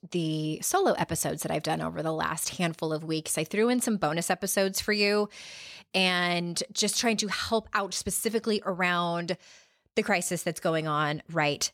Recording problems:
none

